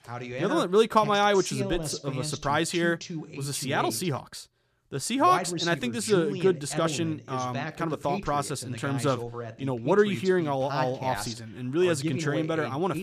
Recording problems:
voice in the background; loud; throughout; 8 dB below the speech

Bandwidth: 14.5 kHz